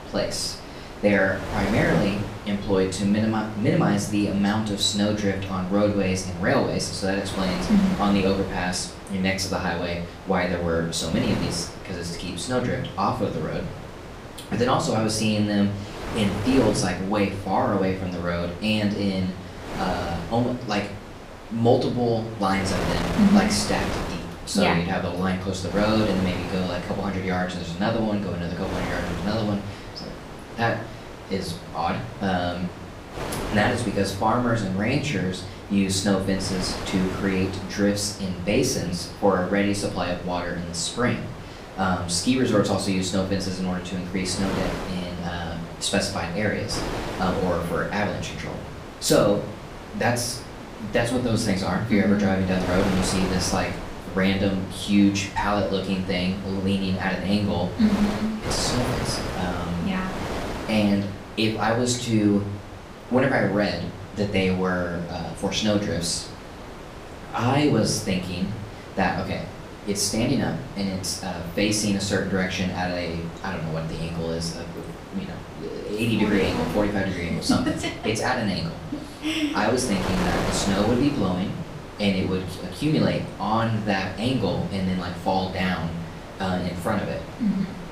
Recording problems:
off-mic speech; far
room echo; slight; dies away in 0.5 s
wind noise on the microphone; heavy; 10 dB below the speech

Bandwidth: 15 kHz